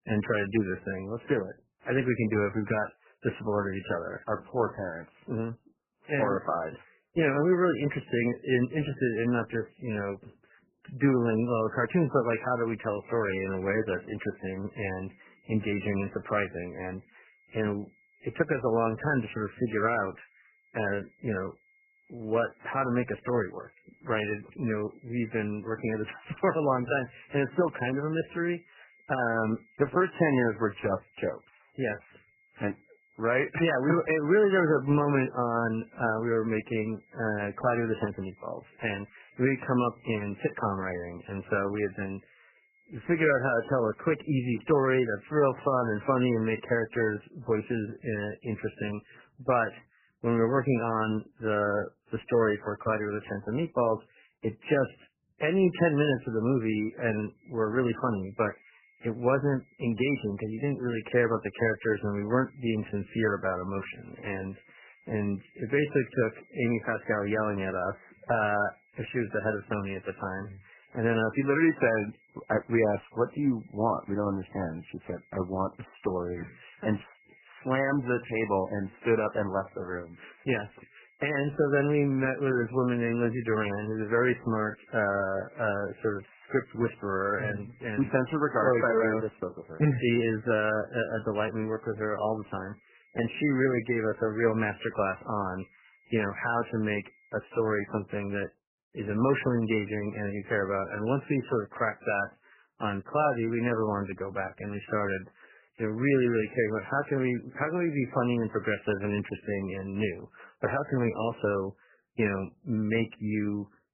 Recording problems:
garbled, watery; badly; nothing above 3 kHz
high-pitched whine; faint; from 12 to 45 s and from 57 s to 1:38; 2 kHz, 35 dB below the speech

